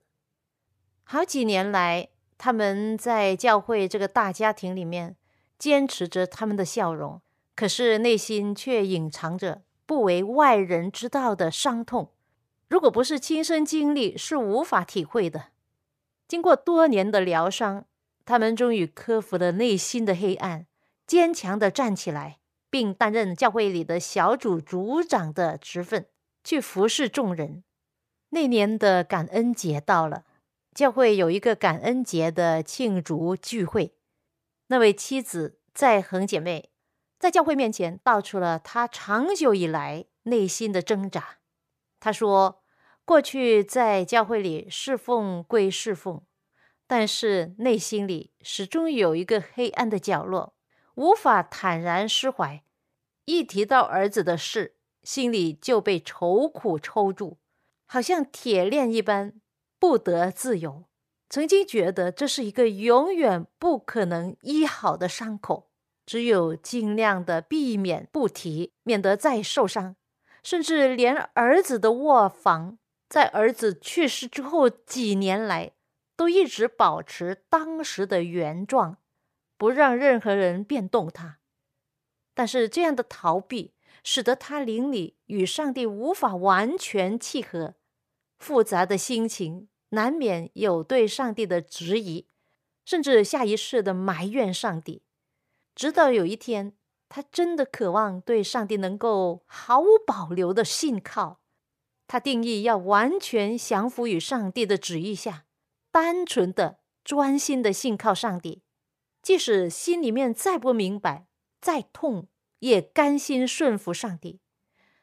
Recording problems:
uneven, jittery; strongly; from 11 s to 1:46

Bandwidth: 14.5 kHz